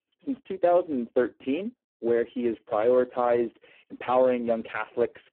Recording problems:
phone-call audio; poor line; nothing above 3.5 kHz

